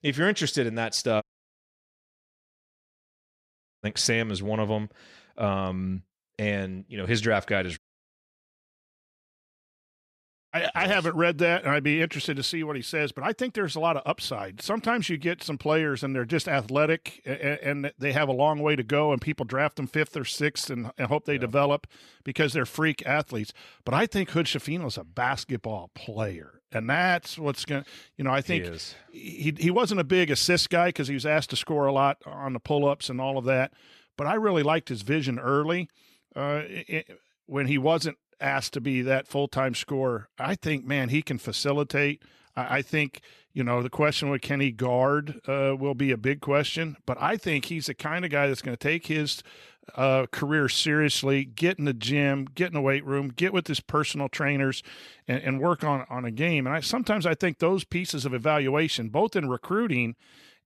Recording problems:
audio cutting out; at 1 s for 2.5 s and at 8 s for 2.5 s

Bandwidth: 13.5 kHz